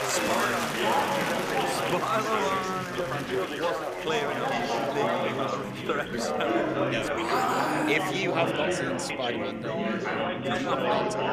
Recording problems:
chatter from many people; very loud; throughout; 4 dB above the speech

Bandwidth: 14.5 kHz